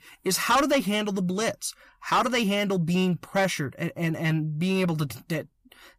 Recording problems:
distortion; heavy; 7 dB below the speech

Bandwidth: 15 kHz